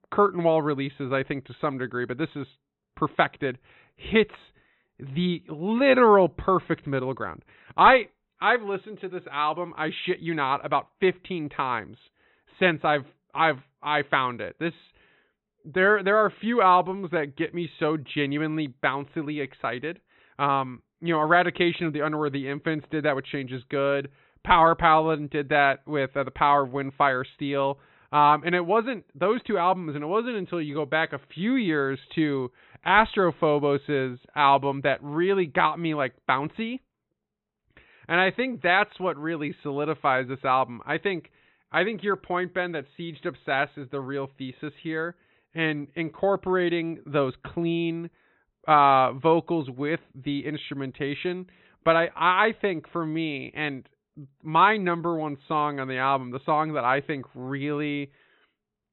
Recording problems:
high frequencies cut off; severe; nothing above 4 kHz

